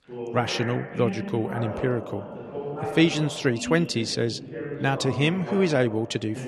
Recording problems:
voice in the background; loud; throughout; 9 dB below the speech

